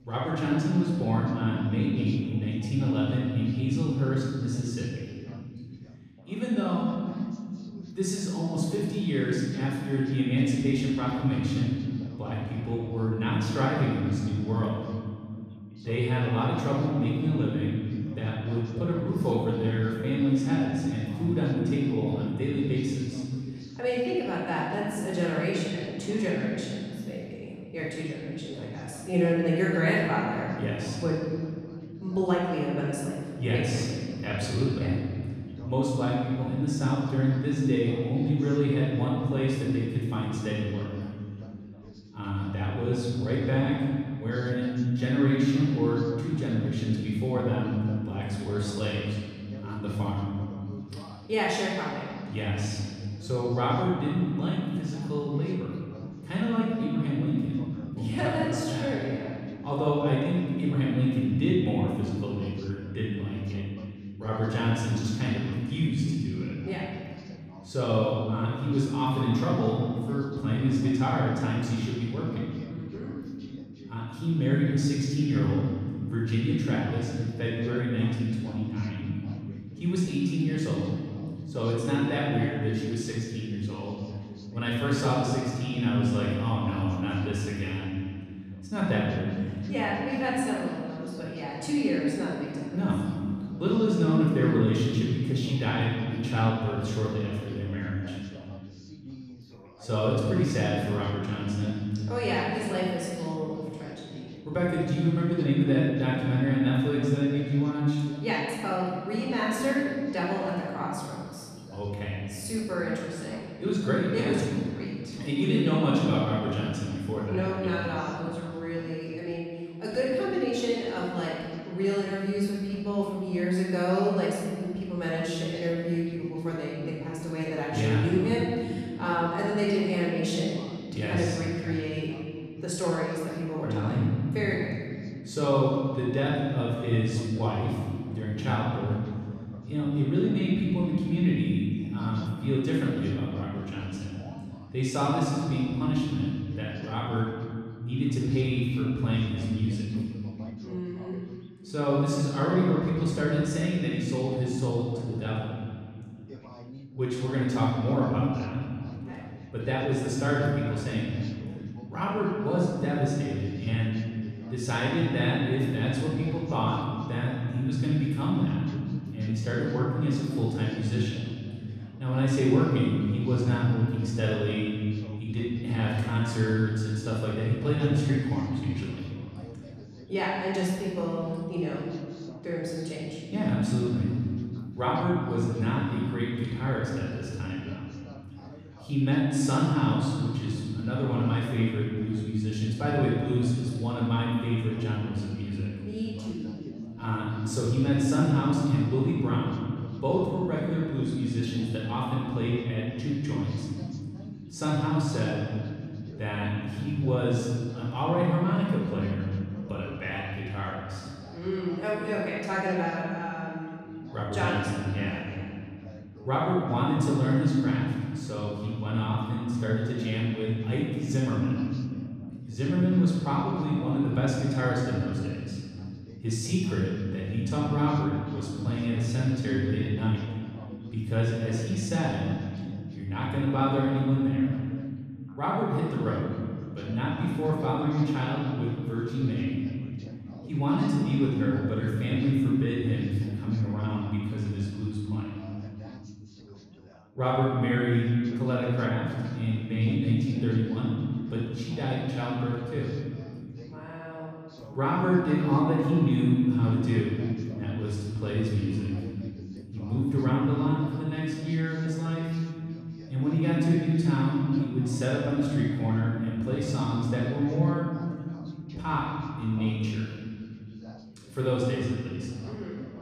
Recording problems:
room echo; strong; dies away in 2.2 s
off-mic speech; far
background chatter; faint; throughout; 3 voices, 20 dB below the speech

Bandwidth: 14.5 kHz